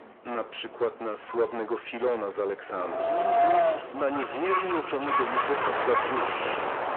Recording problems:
distortion; heavy; 8 dB below the speech
echo of what is said; strong; from 3 s on; 130 ms later, 7 dB below the speech
phone-call audio
animal sounds; very loud; throughout; 2 dB above the speech
wind in the background; very loud; throughout; 4 dB above the speech

